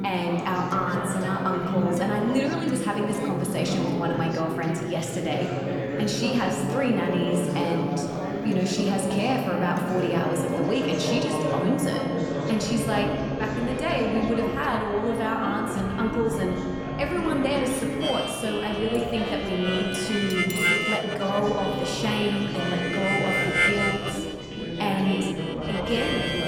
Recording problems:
room echo; slight; dies away in 1.5 s
off-mic speech; somewhat distant
background music; loud; throughout; 4 dB below the speech
chatter from many people; loud; throughout; 3 dB below the speech
clattering dishes; noticeable; from 19 to 21 s; peak 9 dB below the speech
clattering dishes; faint; at 24 s; peak 20 dB below the speech

